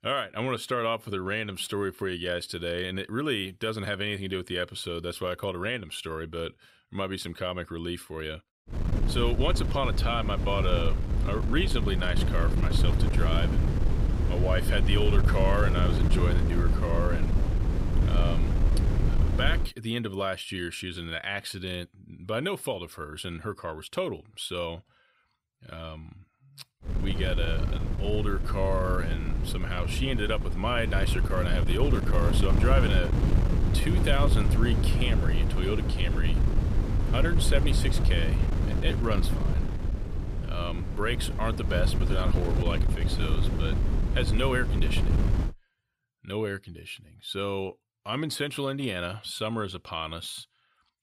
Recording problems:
wind noise on the microphone; heavy; from 8.5 to 20 s and from 27 to 45 s; 6 dB below the speech

